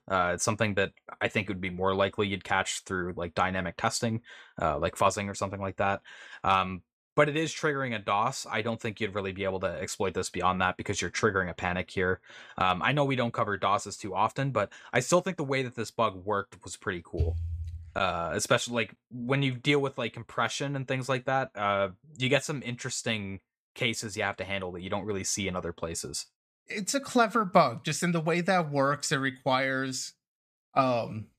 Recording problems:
none

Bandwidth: 15 kHz